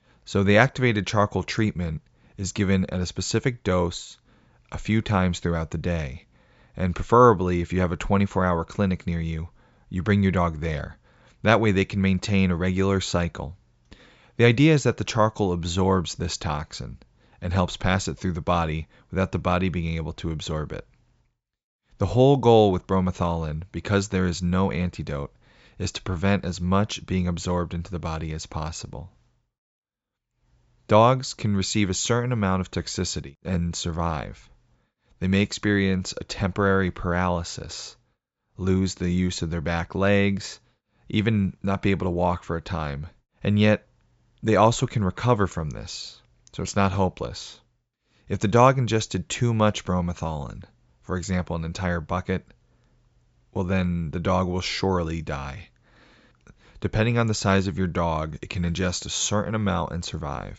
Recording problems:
high frequencies cut off; noticeable; nothing above 8 kHz

